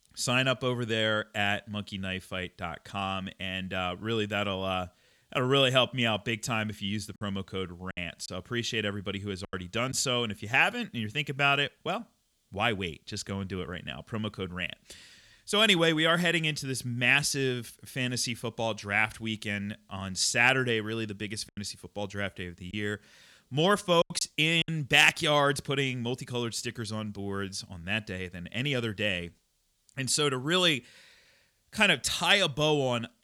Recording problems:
choppy; very; from 7 to 10 s and from 21 to 25 s; 6% of the speech affected

